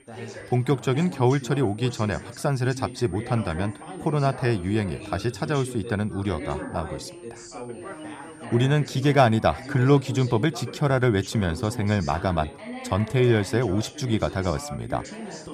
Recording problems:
background chatter; noticeable; throughout; 3 voices, 15 dB below the speech
high-pitched whine; faint; throughout; 9 kHz, 30 dB below the speech

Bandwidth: 14.5 kHz